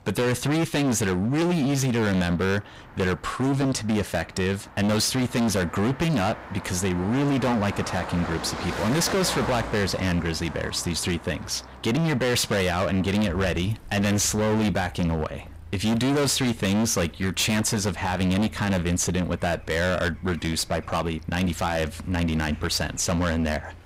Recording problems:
distortion; heavy; 24% of the sound clipped
traffic noise; noticeable; throughout; 15 dB below the speech

